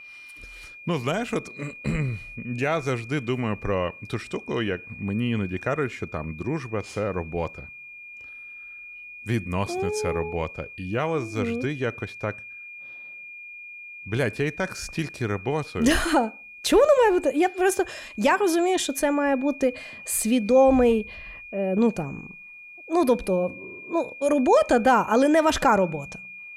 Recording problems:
high-pitched whine; noticeable; throughout; 2.5 kHz, 15 dB below the speech

